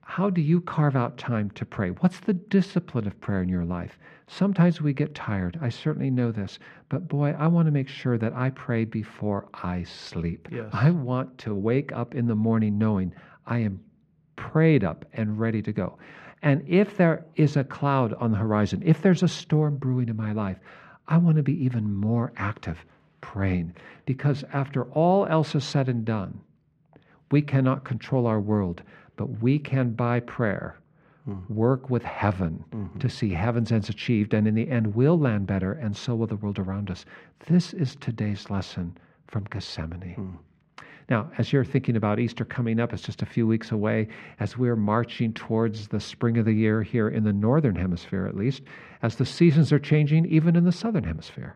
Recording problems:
muffled; slightly; fading above 2 kHz

